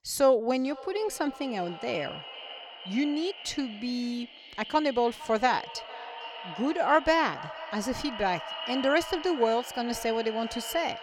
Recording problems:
echo of what is said; strong; throughout; 460 ms later, 10 dB below the speech

